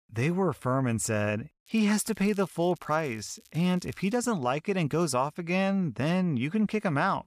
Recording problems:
crackling; faint; from 1.5 to 4 s; 30 dB below the speech

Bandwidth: 14.5 kHz